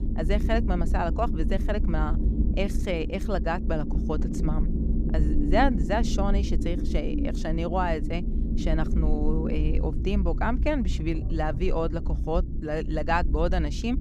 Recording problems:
low rumble; loud; throughout; 9 dB below the speech

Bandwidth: 15 kHz